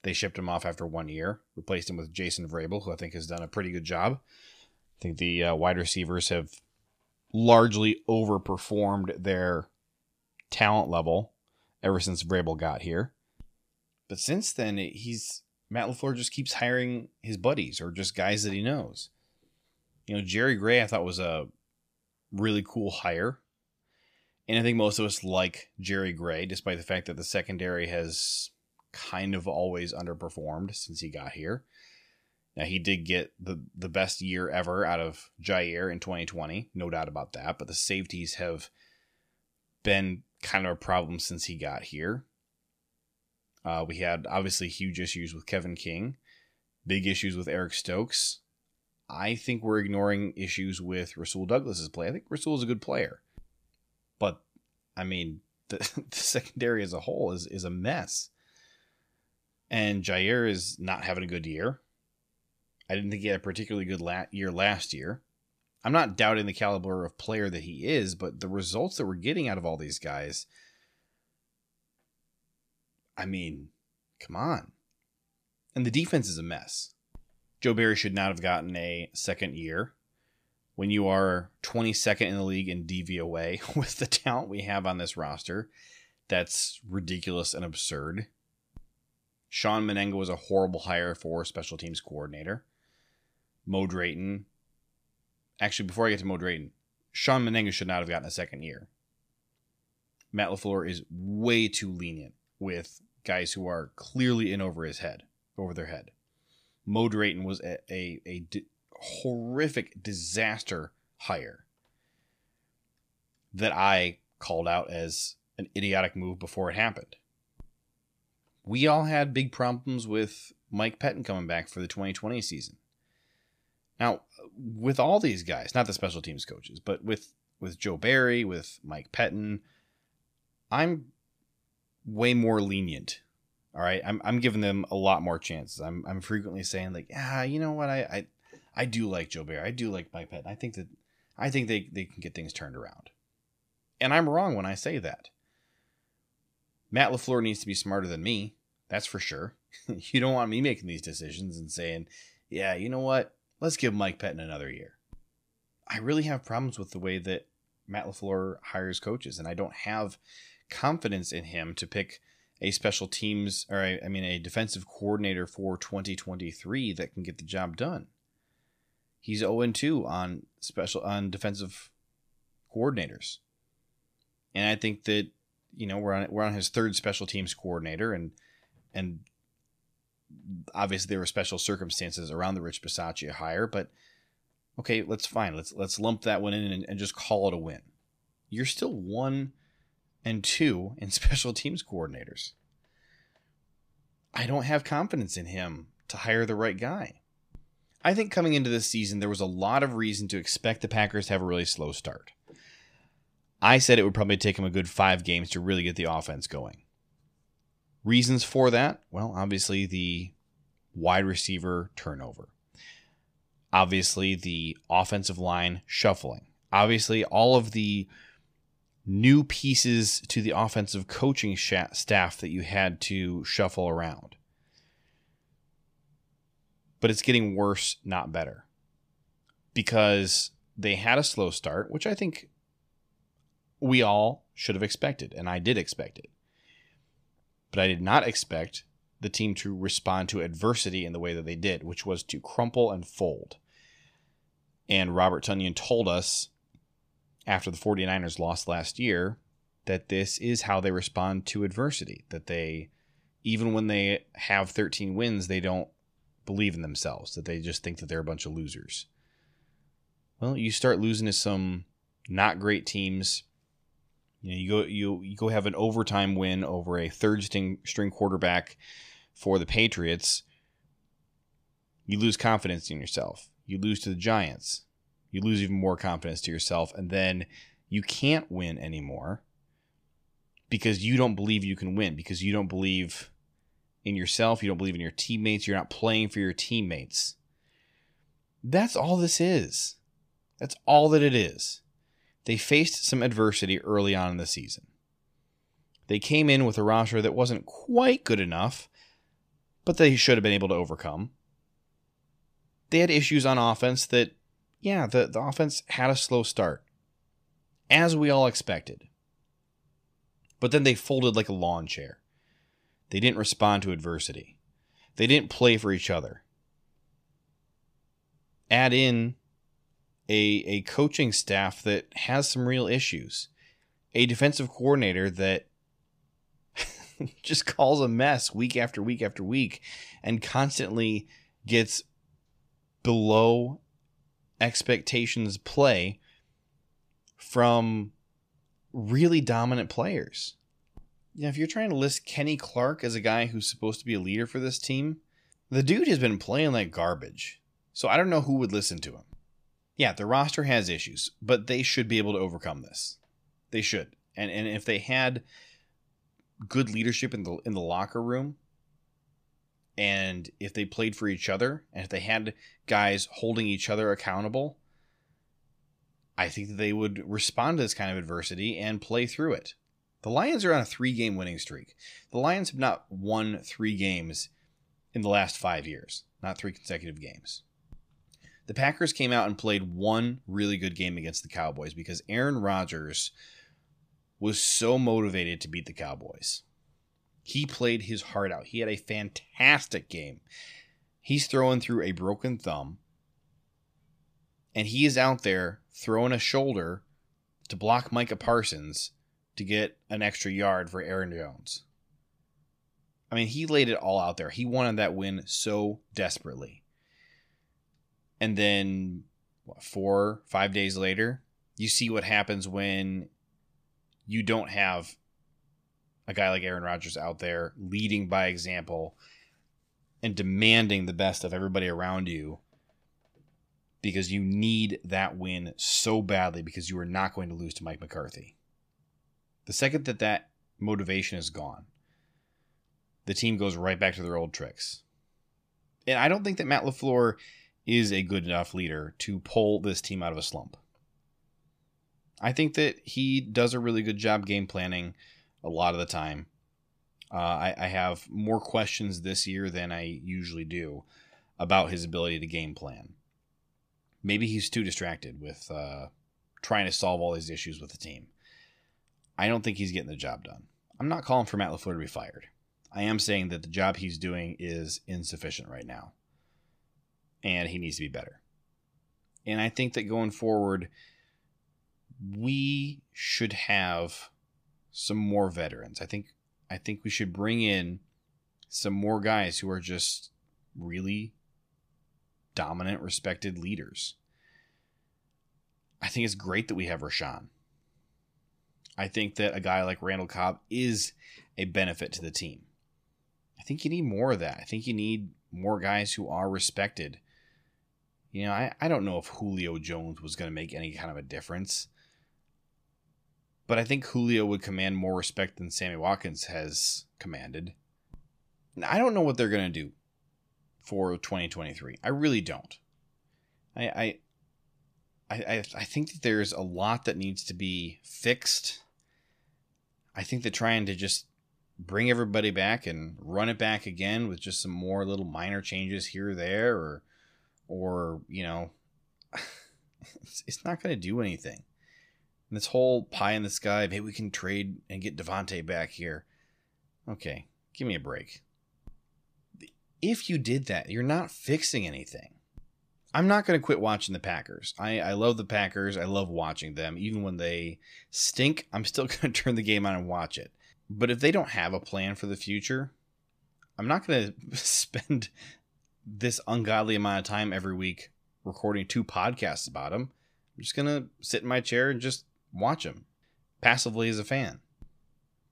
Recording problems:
none

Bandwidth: 14.5 kHz